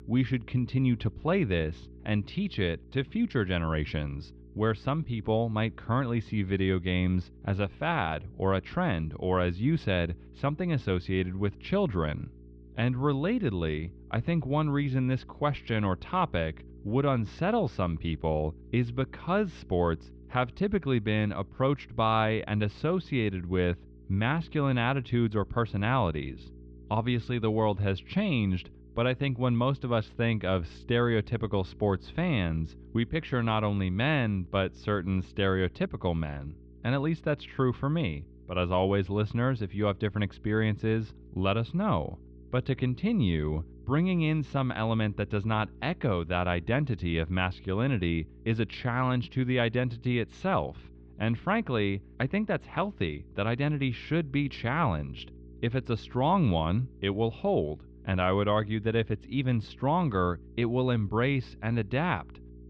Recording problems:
muffled; slightly; fading above 3.5 kHz
electrical hum; faint; throughout; 60 Hz, 25 dB below the speech

